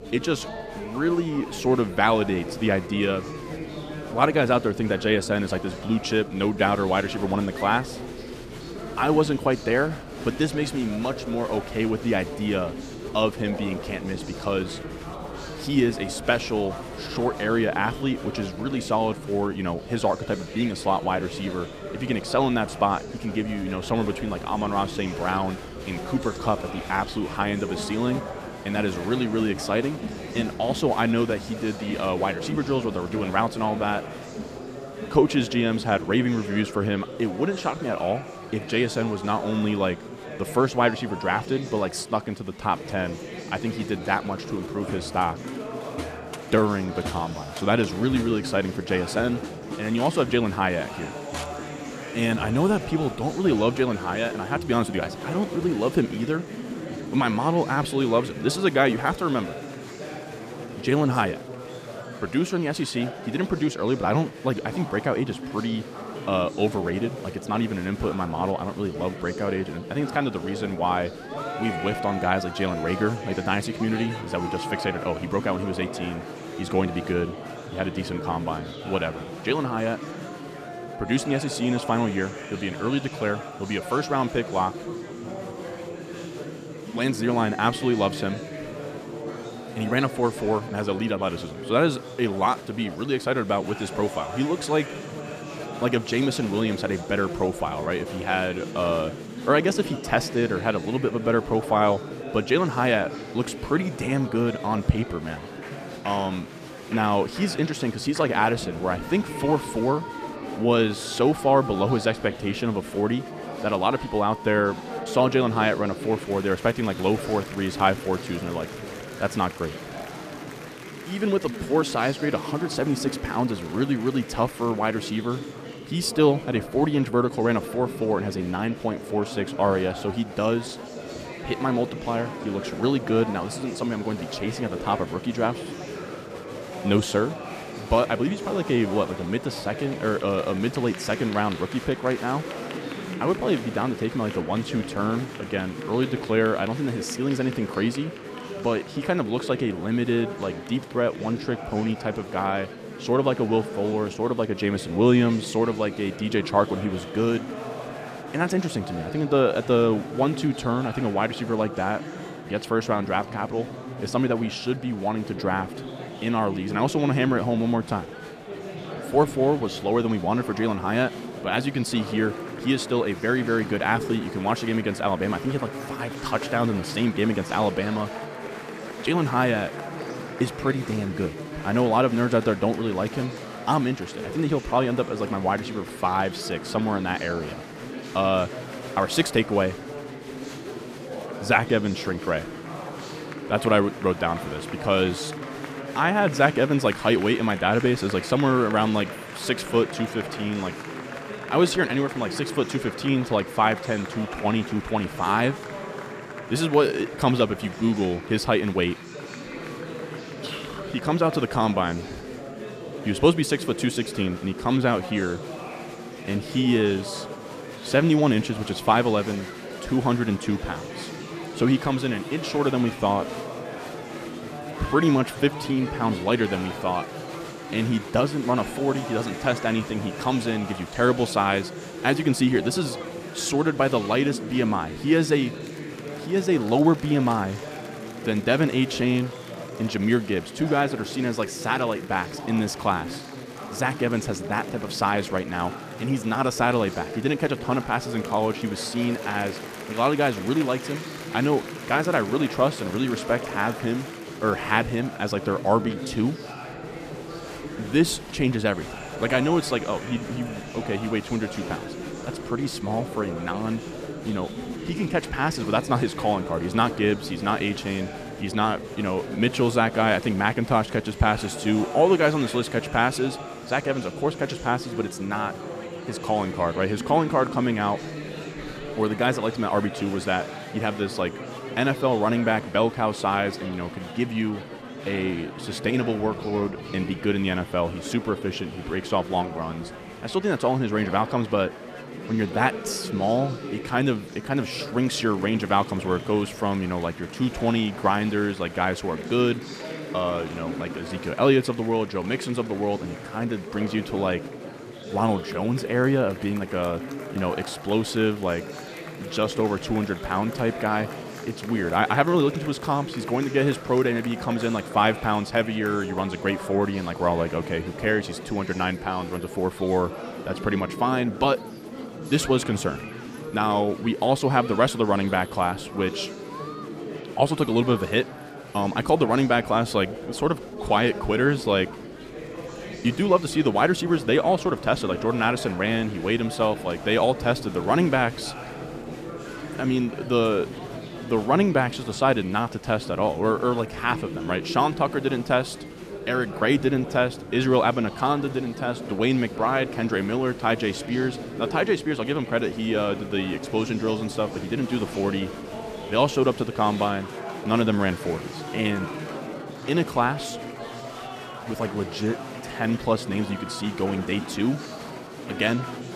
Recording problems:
chatter from many people; noticeable; throughout; 10 dB below the speech

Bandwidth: 14.5 kHz